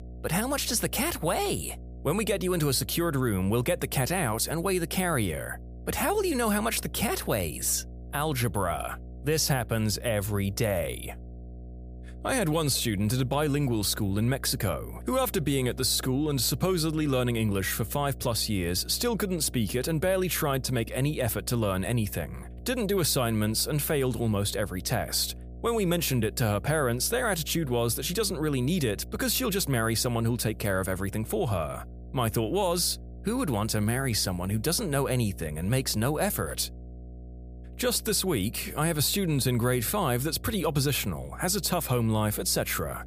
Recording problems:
electrical hum; faint; throughout; 60 Hz, 25 dB below the speech

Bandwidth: 15 kHz